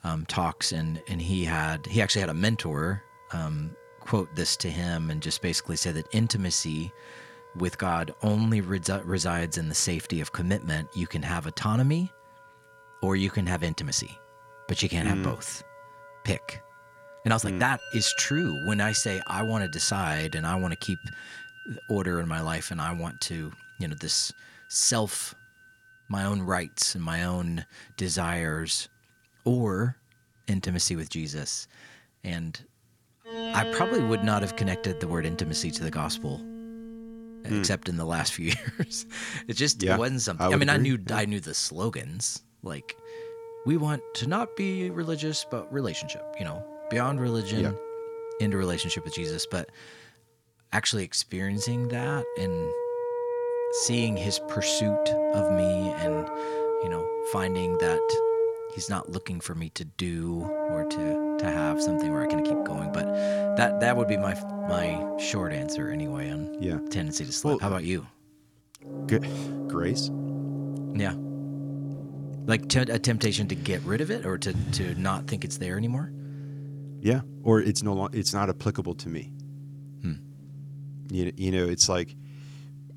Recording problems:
background music; loud; throughout; 4 dB below the speech
uneven, jittery; strongly; from 3 s to 1:18

